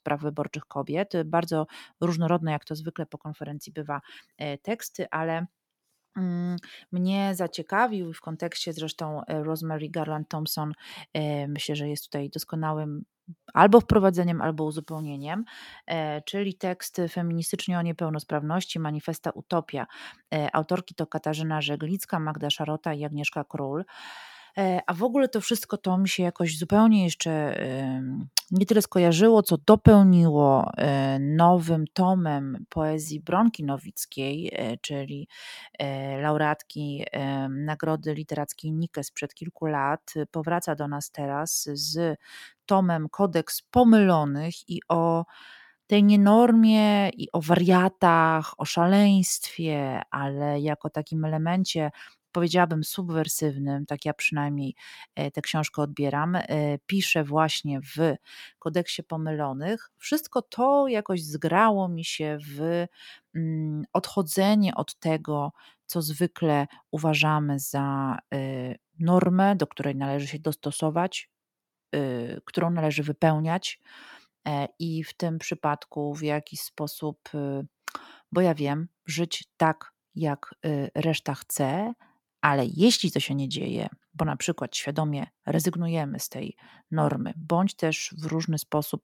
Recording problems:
none

